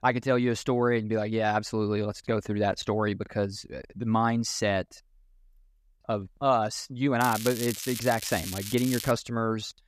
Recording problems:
crackling; loud; from 7 to 9 s; 8 dB below the speech

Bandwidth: 14.5 kHz